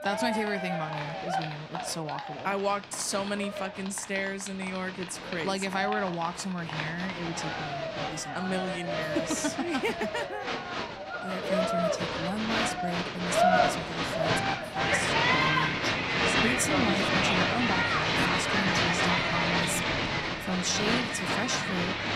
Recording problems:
crowd noise; very loud; throughout; 5 dB above the speech

